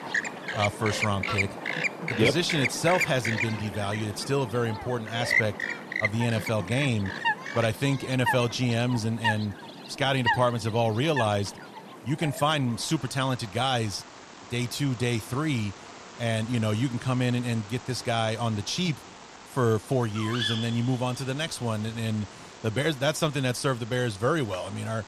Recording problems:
animal sounds; loud; throughout; 4 dB below the speech

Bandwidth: 14 kHz